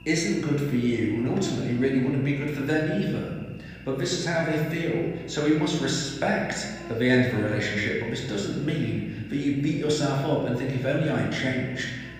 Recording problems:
room echo; noticeable; dies away in 1.3 s
off-mic speech; somewhat distant
electrical hum; faint; throughout; 60 Hz, 20 dB below the speech

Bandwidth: 15 kHz